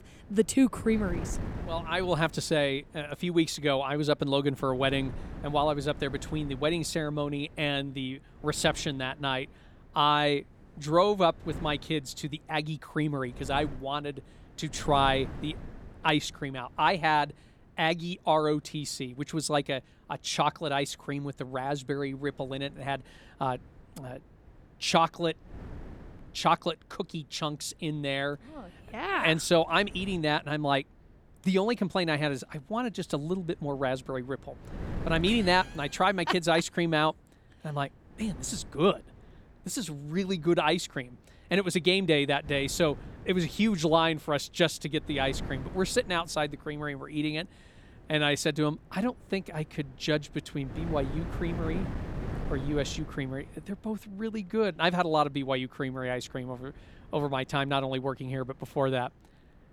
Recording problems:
wind noise on the microphone; occasional gusts; 20 dB below the speech

